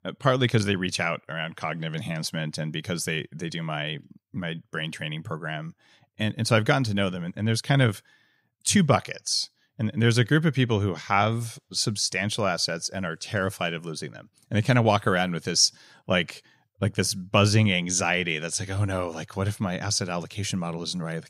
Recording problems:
none

